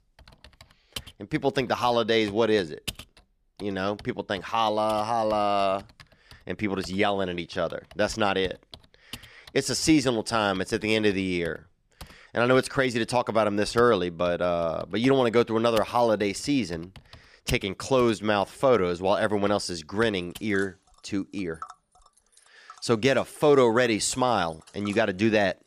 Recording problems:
household noises; faint; throughout; 20 dB below the speech

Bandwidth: 14.5 kHz